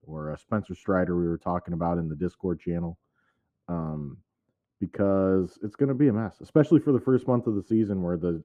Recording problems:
muffled; very; fading above 2 kHz

